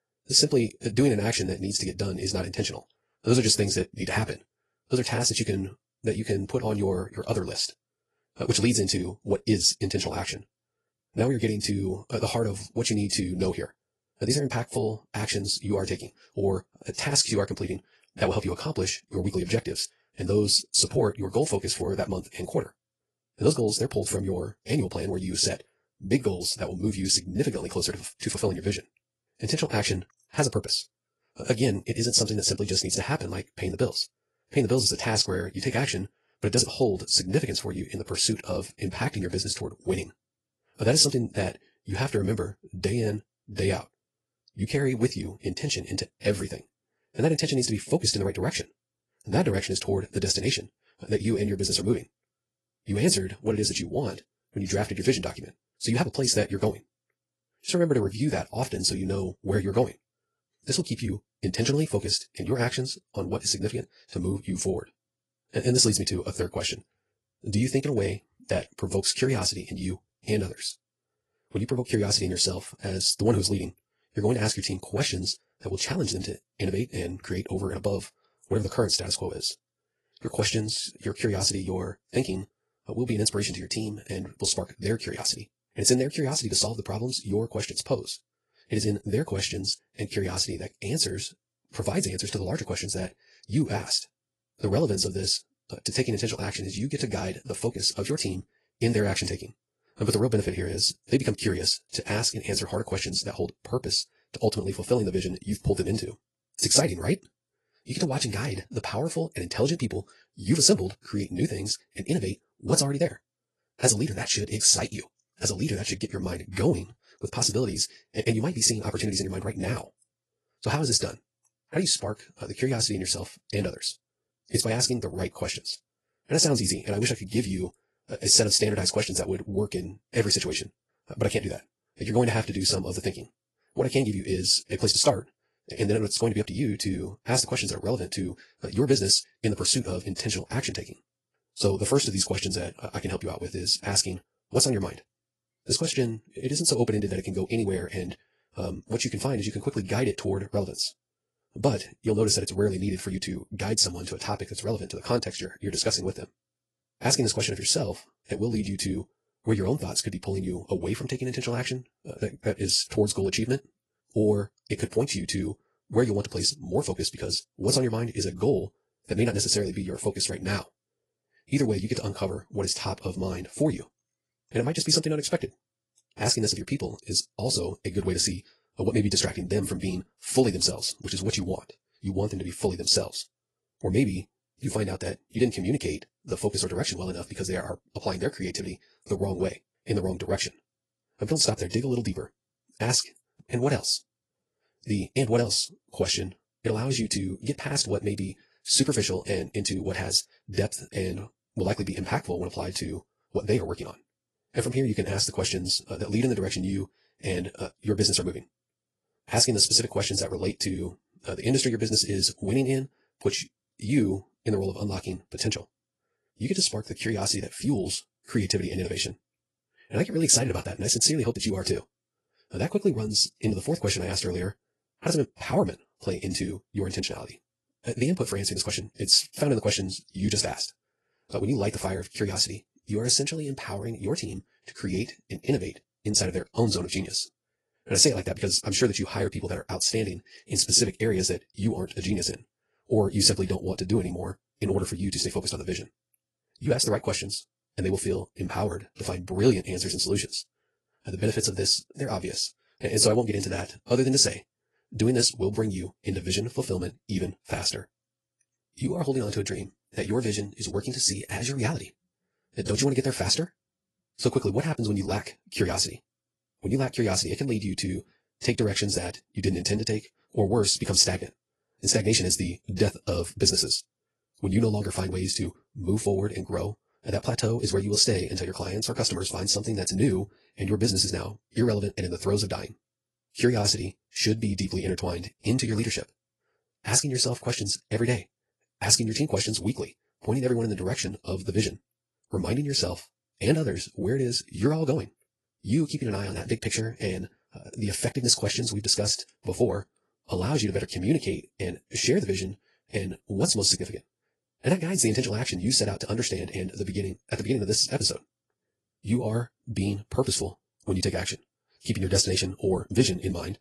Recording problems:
wrong speed, natural pitch; too fast; 1.7 times normal speed
garbled, watery; slightly

